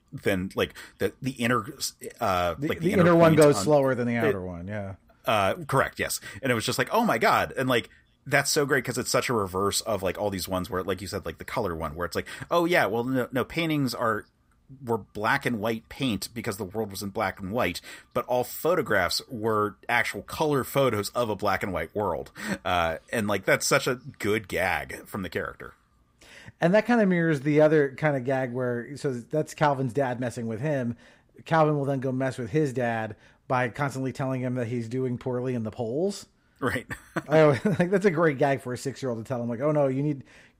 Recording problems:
none

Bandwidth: 15.5 kHz